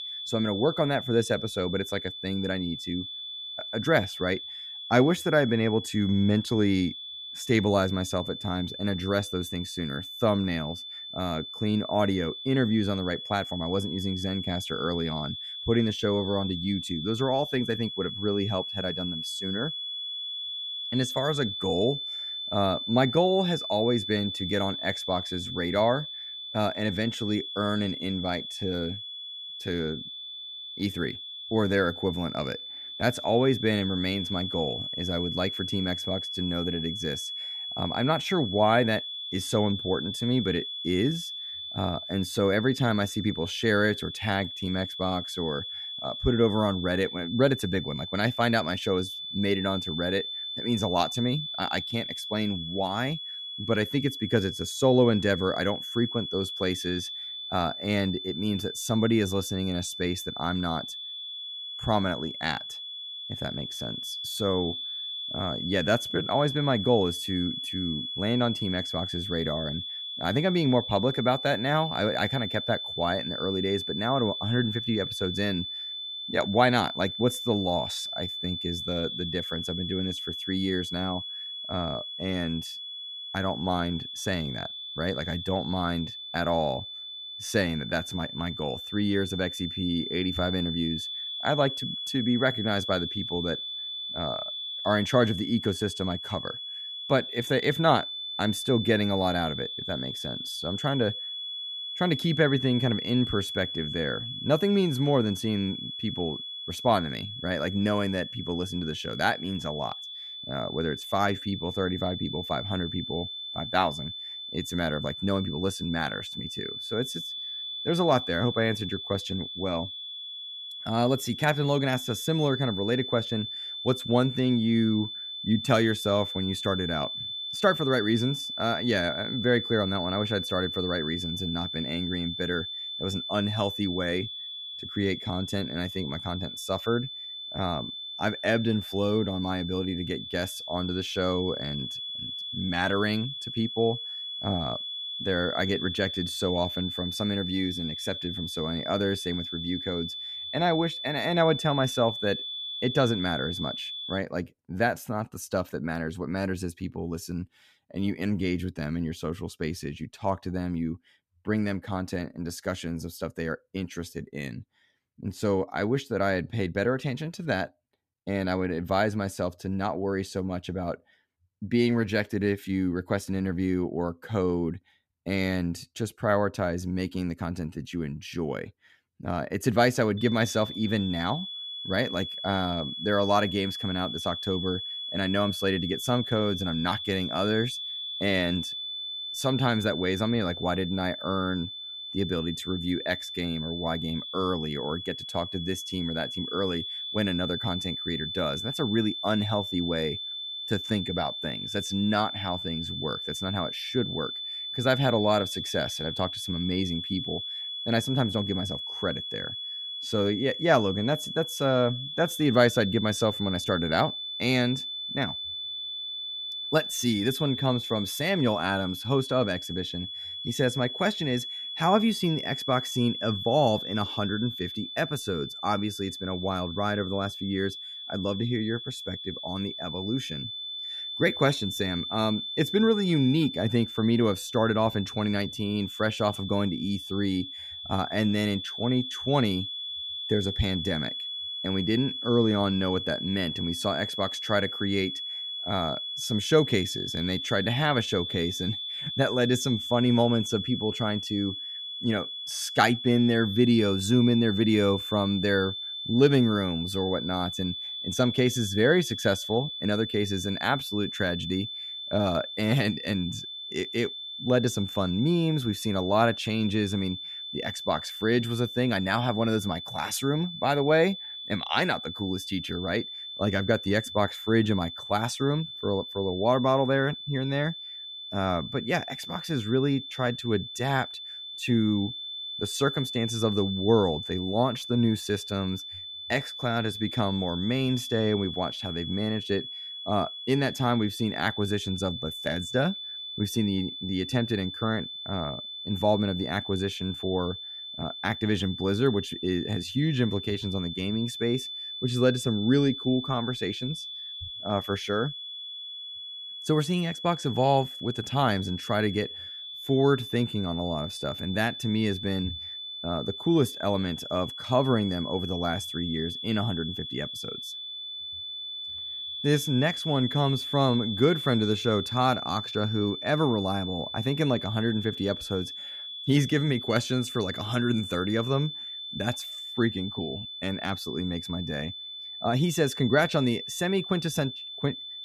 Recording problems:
high-pitched whine; loud; until 2:34 and from 3:00 on; 3.5 kHz, 6 dB below the speech

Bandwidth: 14.5 kHz